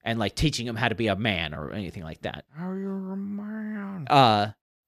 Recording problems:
none

